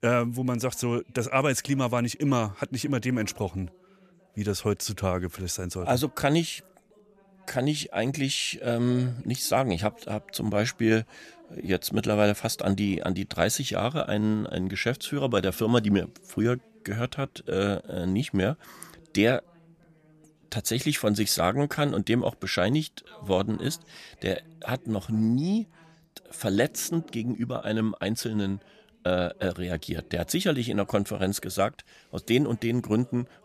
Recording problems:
voice in the background; faint; throughout; 30 dB below the speech

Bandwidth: 14.5 kHz